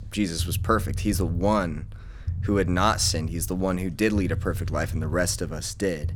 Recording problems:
low rumble; faint; throughout; 20 dB below the speech

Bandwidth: 17.5 kHz